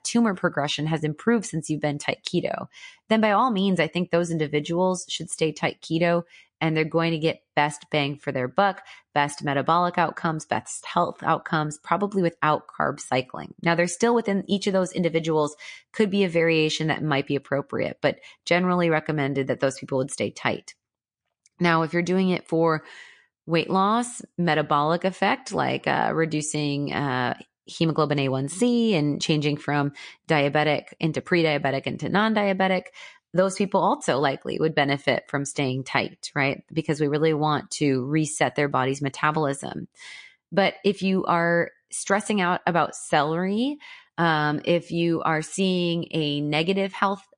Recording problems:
garbled, watery; slightly; nothing above 9.5 kHz

